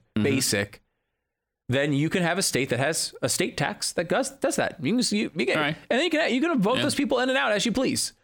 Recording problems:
squashed, flat; heavily

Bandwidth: 17.5 kHz